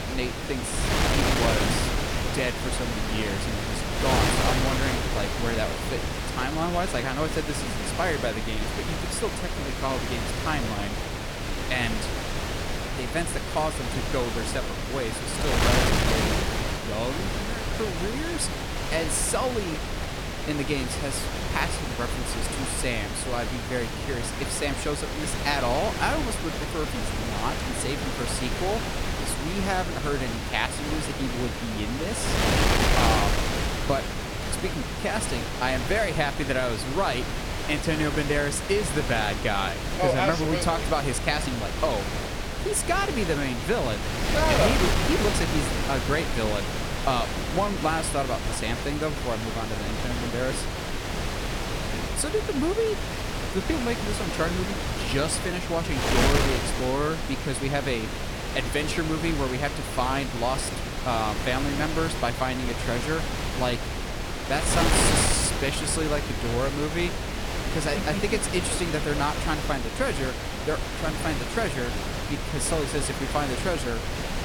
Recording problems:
wind noise on the microphone; heavy; 1 dB below the speech

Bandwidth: 17.5 kHz